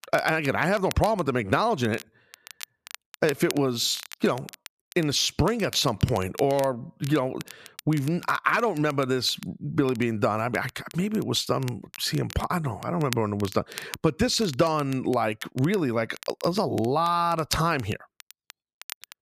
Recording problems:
crackle, like an old record; noticeable; 15 dB below the speech

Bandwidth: 14.5 kHz